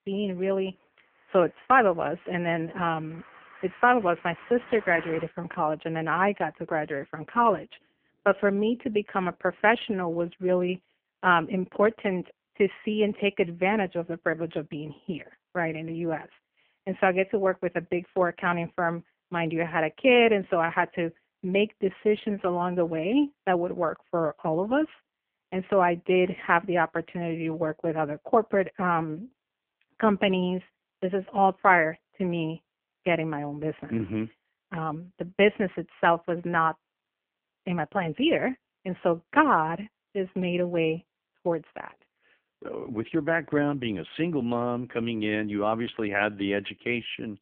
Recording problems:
phone-call audio; poor line
traffic noise; faint; until 10 s; 20 dB below the speech

